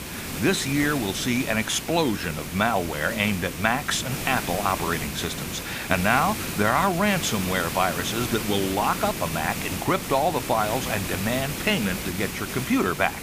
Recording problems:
hiss; loud; throughout; 6 dB below the speech

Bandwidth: 15 kHz